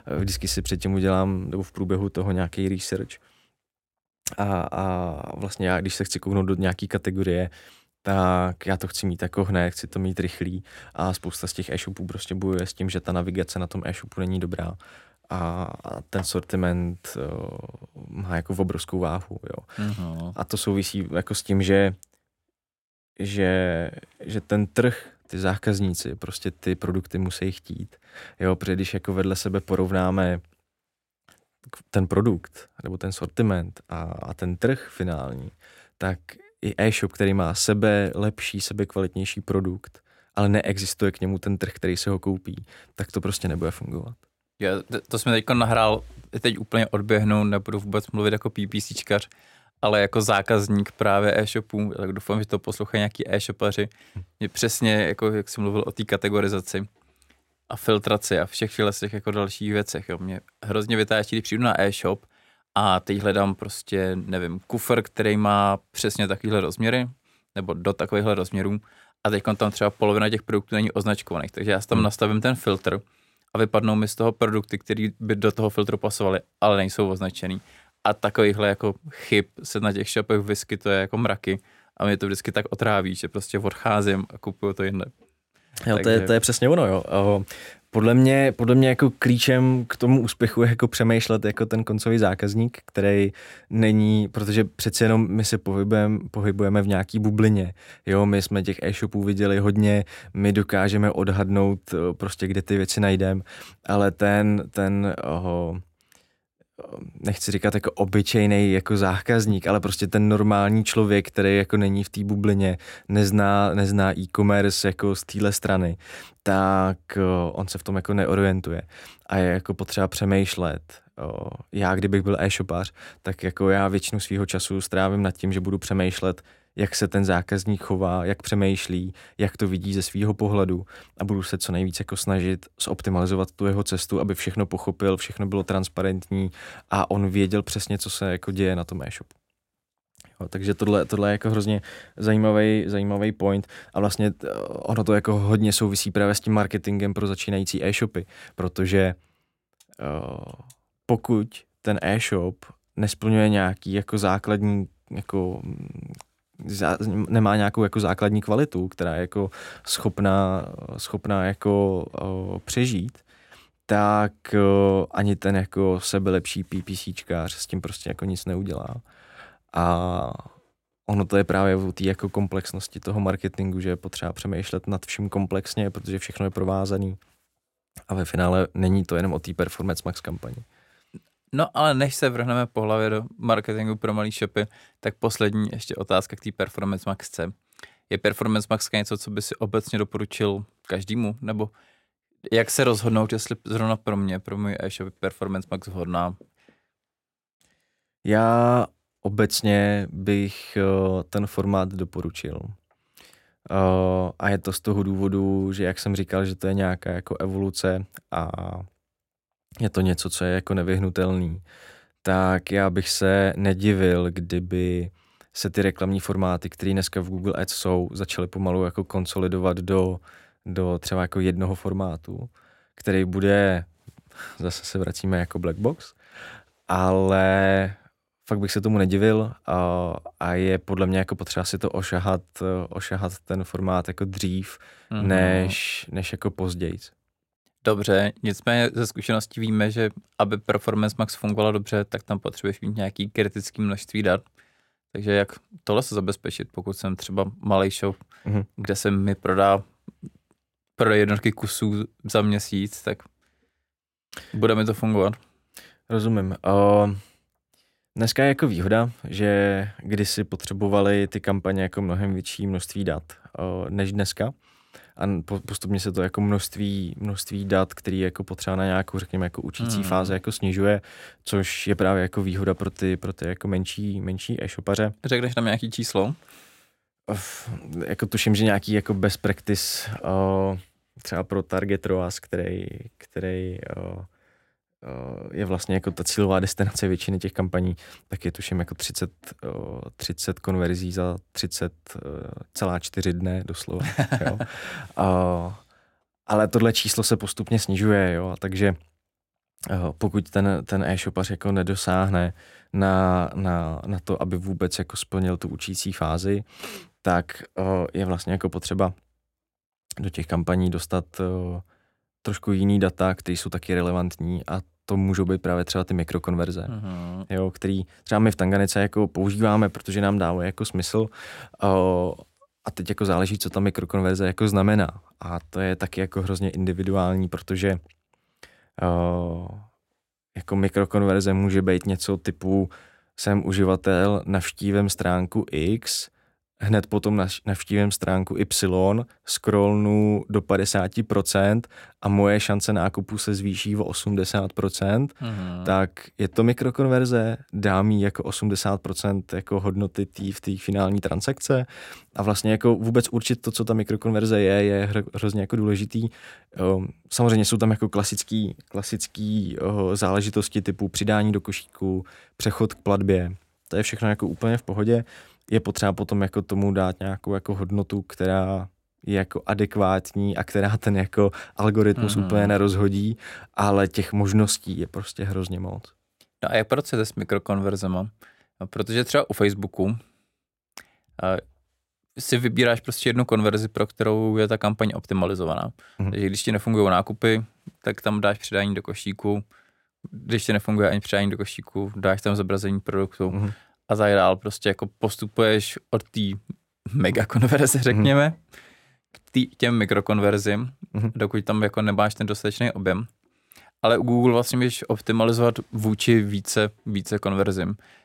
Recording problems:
none

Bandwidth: 16 kHz